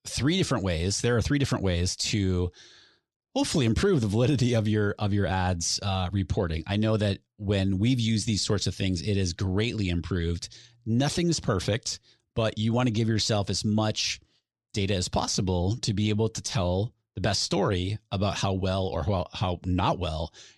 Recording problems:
none

